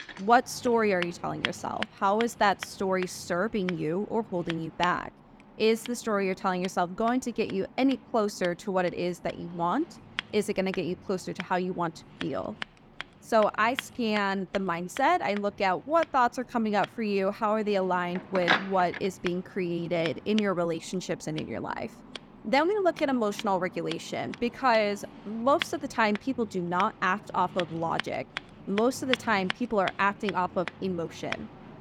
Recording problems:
household noises; noticeable; throughout; 10 dB below the speech

